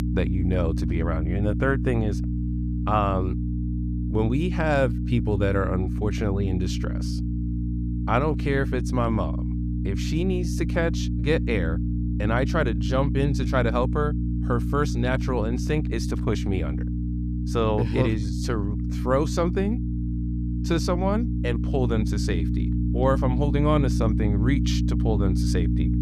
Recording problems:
electrical hum; loud; throughout; 60 Hz, 8 dB below the speech

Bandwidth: 14.5 kHz